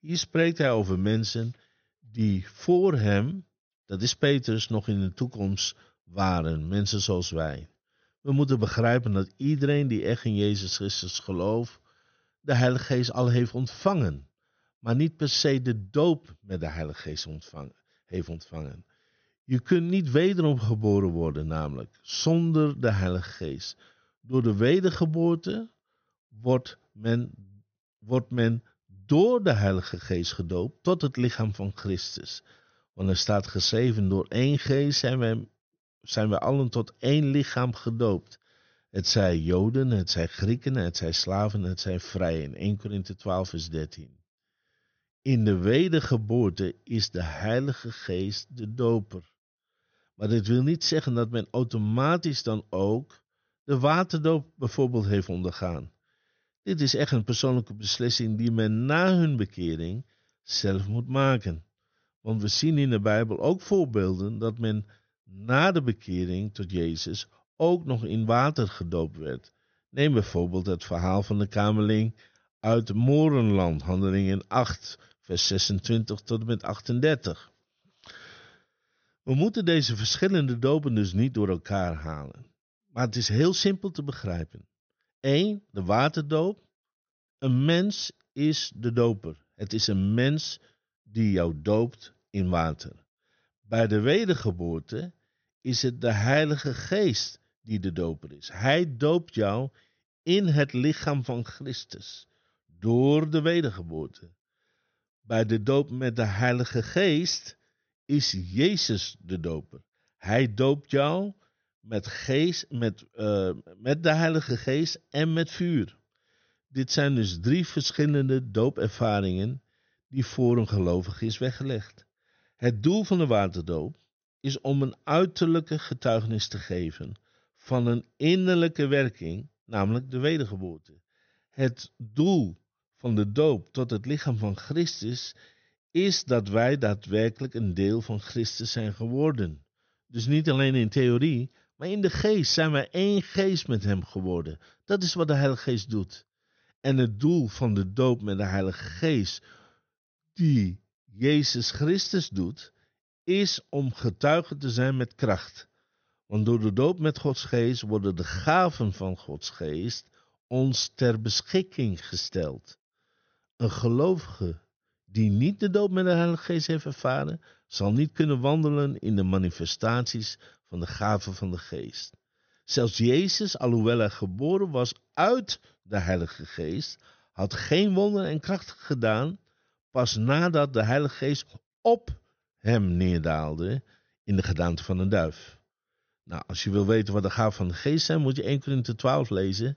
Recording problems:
high frequencies cut off; noticeable; nothing above 6.5 kHz

